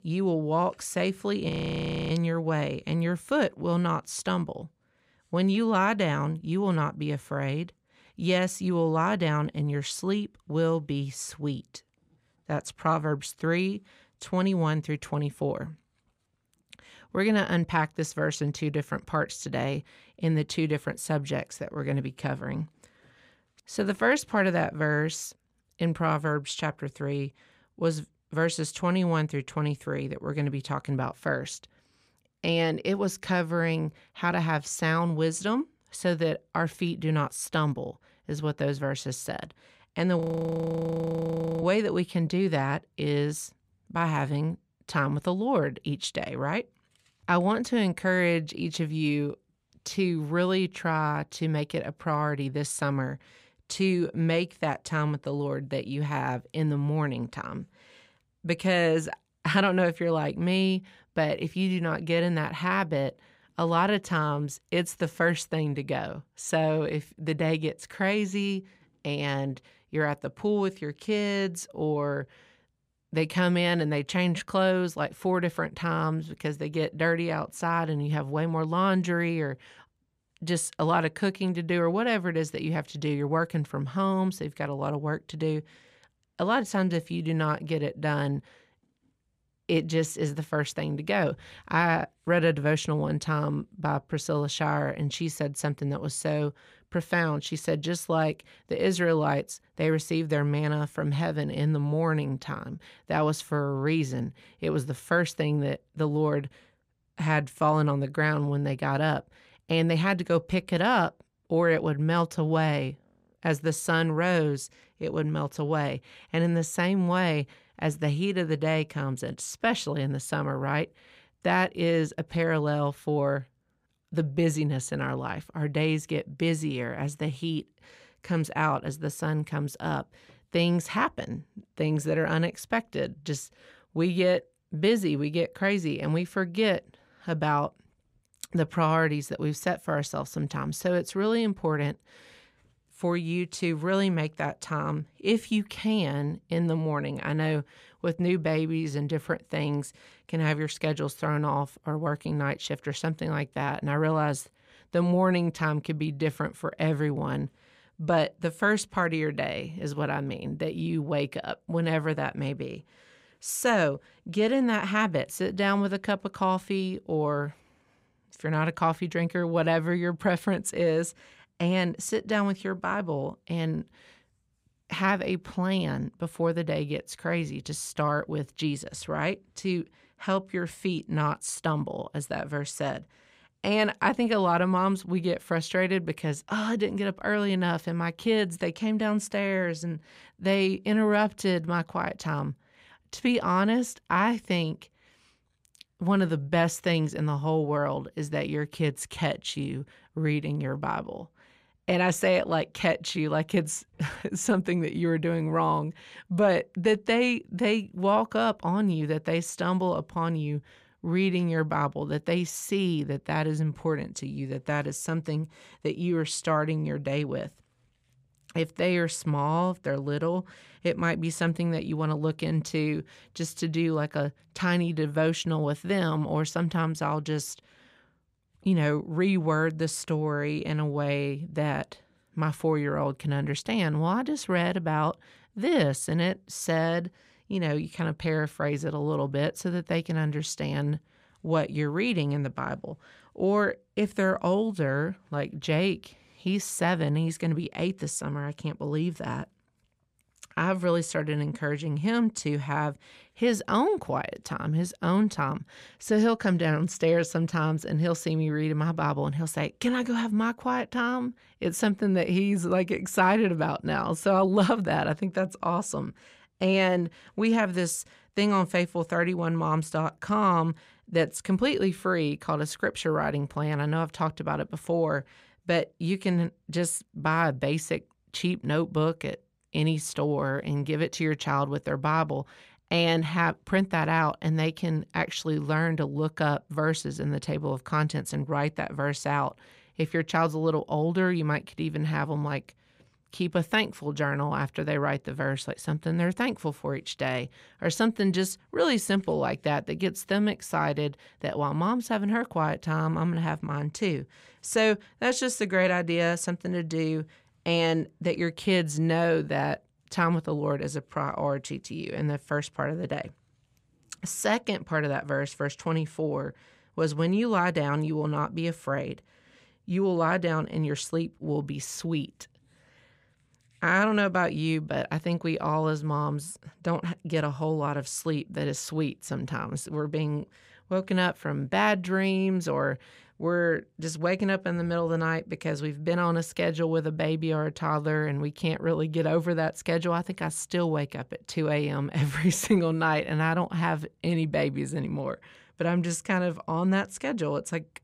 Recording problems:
audio freezing; at 1.5 s for 0.5 s and at 40 s for 1.5 s

